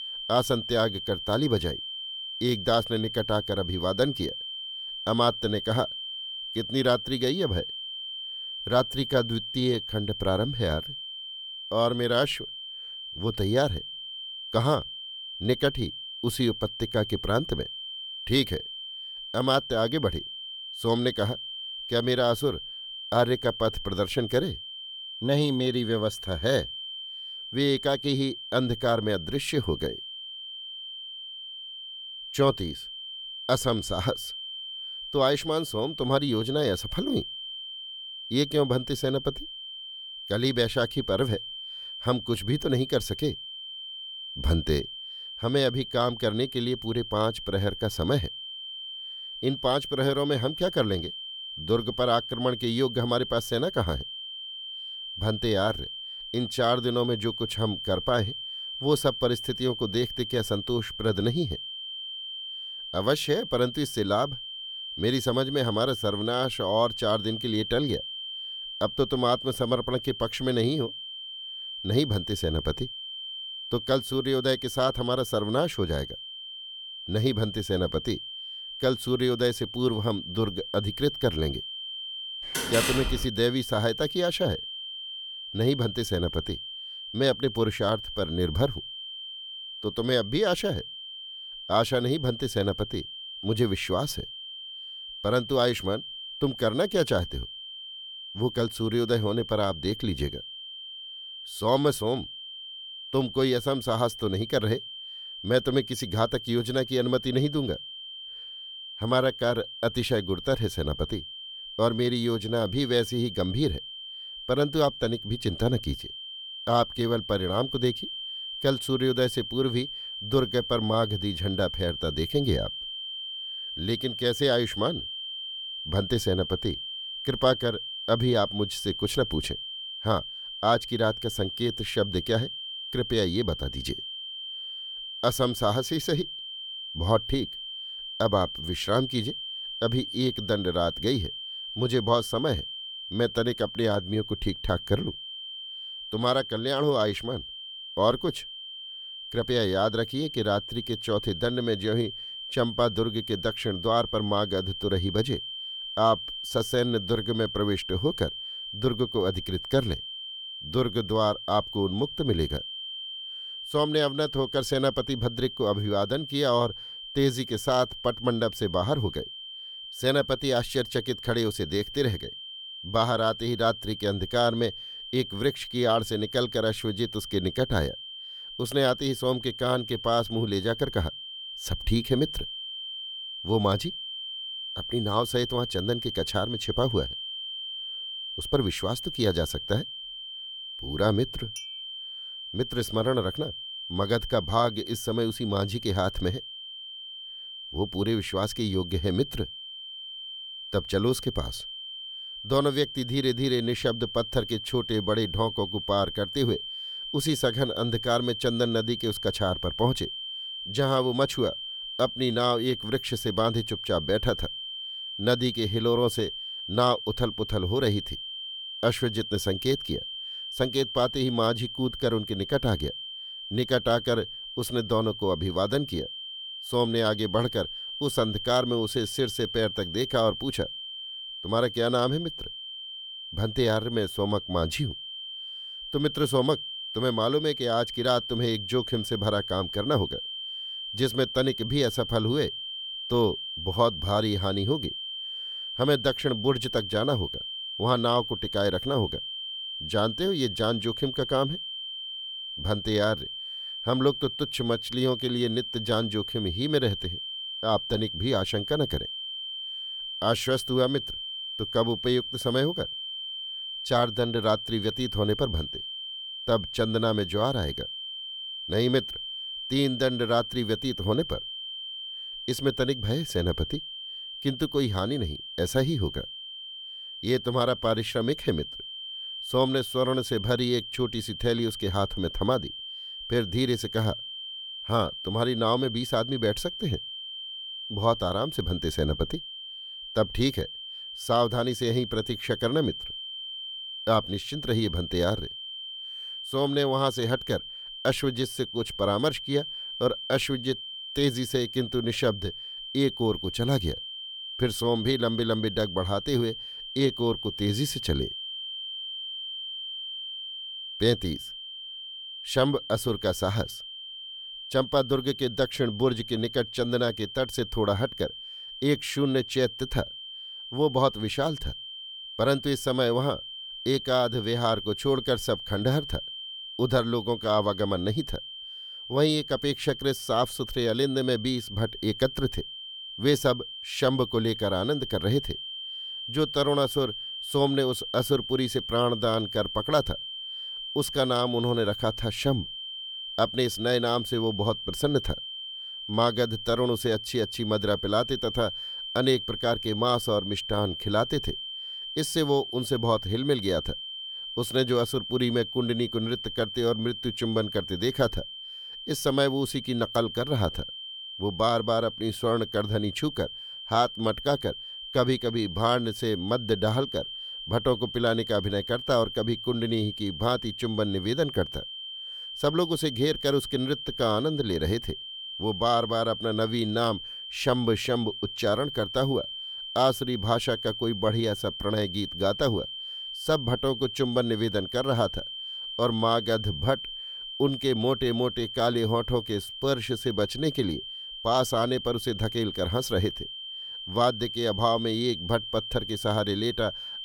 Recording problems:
high-pitched whine; loud; throughout; 3 kHz, 7 dB below the speech
door banging; loud; at 1:23; peak 1 dB above the speech
clattering dishes; faint; at 3:12; peak 15 dB below the speech

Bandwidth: 18.5 kHz